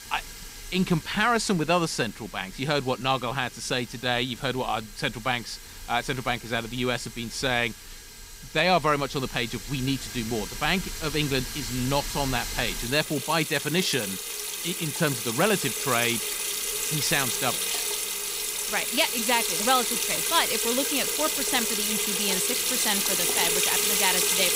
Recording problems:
household noises; very loud; throughout; 1 dB above the speech

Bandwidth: 15.5 kHz